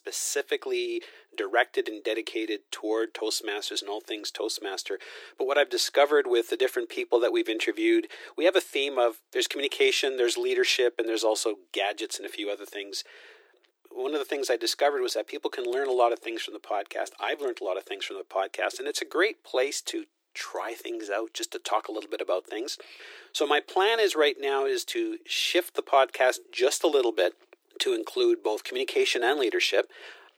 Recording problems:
thin; very; fading below 350 Hz

